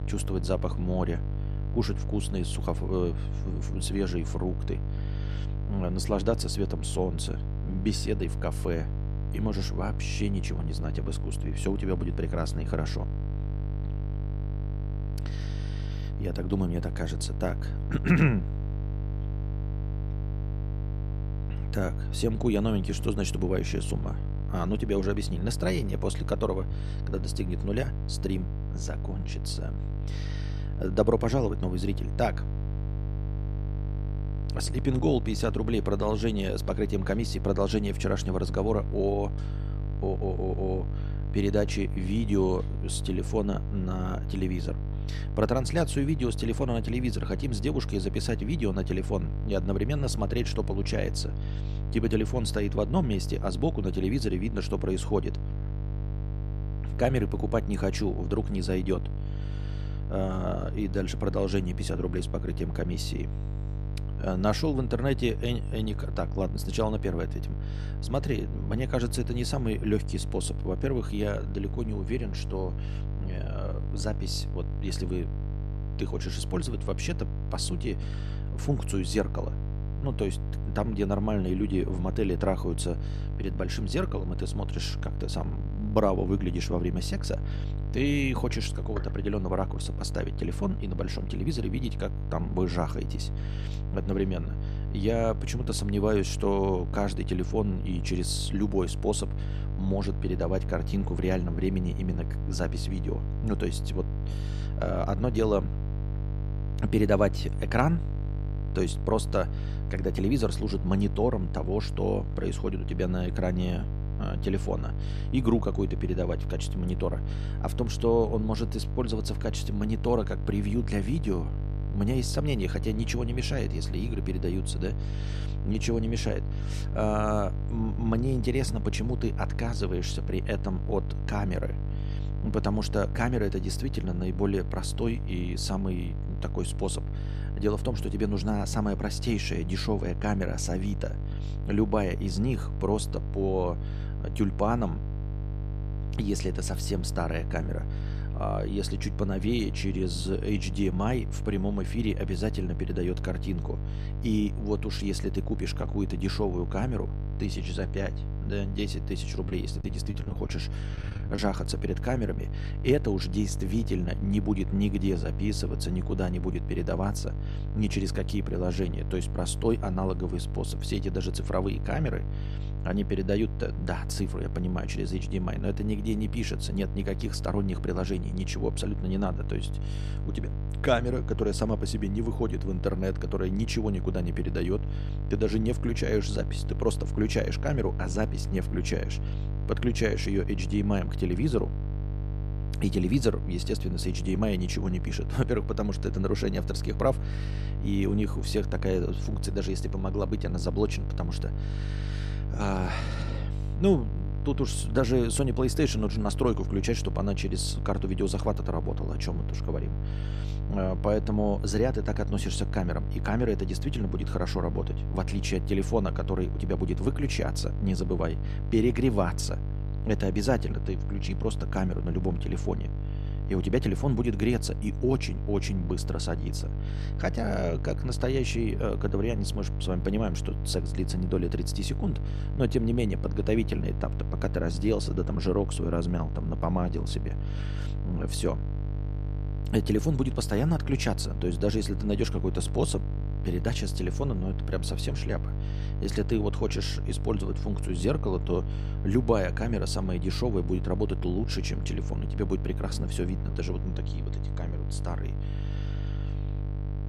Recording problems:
electrical hum; noticeable; throughout; 50 Hz, 10 dB below the speech
choppy; very; from 2:39 to 2:41; 12% of the speech affected

